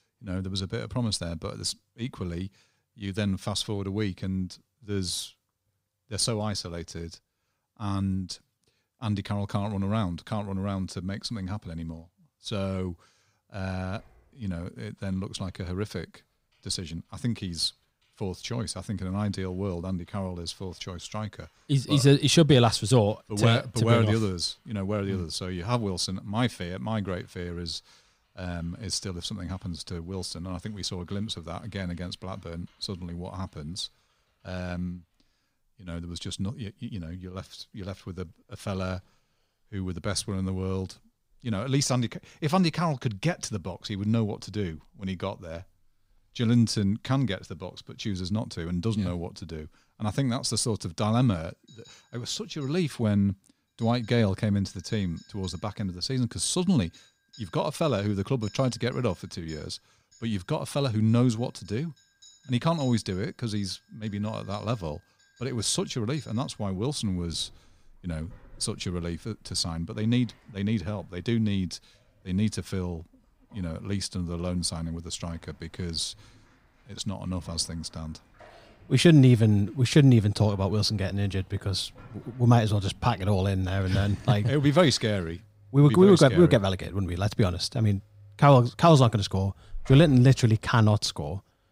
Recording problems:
household noises; faint; throughout; 25 dB below the speech

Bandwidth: 15.5 kHz